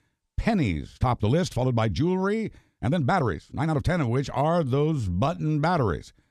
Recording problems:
uneven, jittery; strongly; from 1 to 5.5 s

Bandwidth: 13.5 kHz